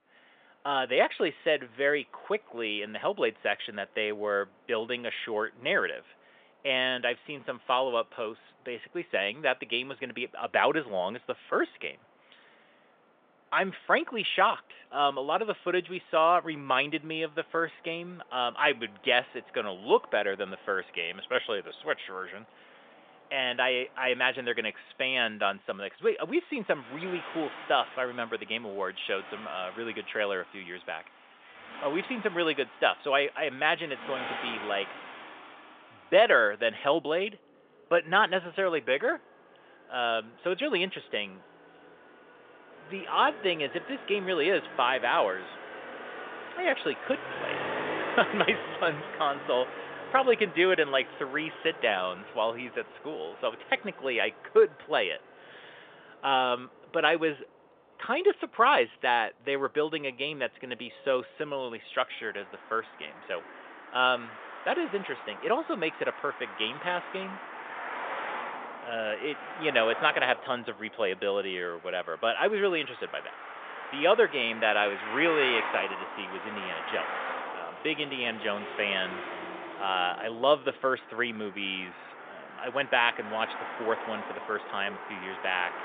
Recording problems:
phone-call audio; nothing above 3.5 kHz
traffic noise; noticeable; throughout; 10 dB below the speech

